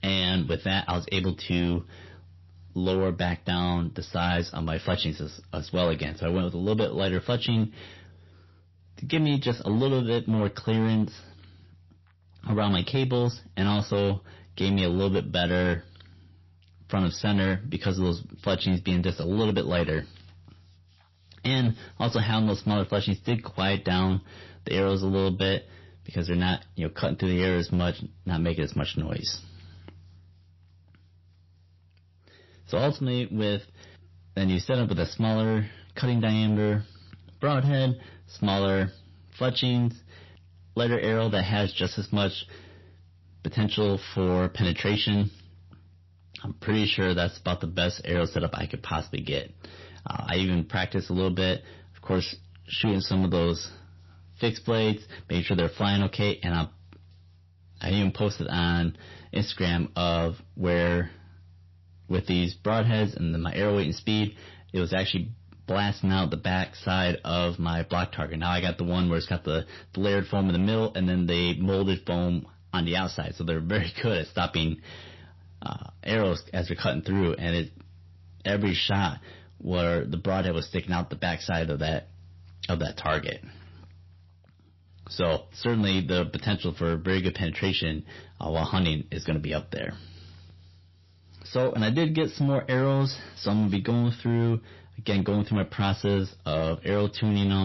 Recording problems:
distortion; slight; 5% of the sound clipped
garbled, watery; slightly; nothing above 5.5 kHz
abrupt cut into speech; at the end

